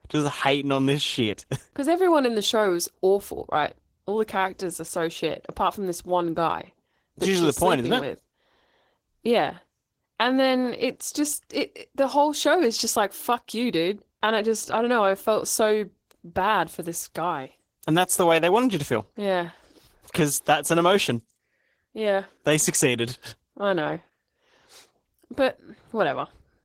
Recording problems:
garbled, watery; slightly; nothing above 16 kHz

